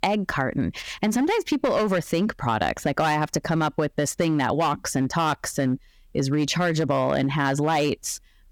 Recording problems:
squashed, flat; heavily
distortion; slight; 6% of the sound clipped

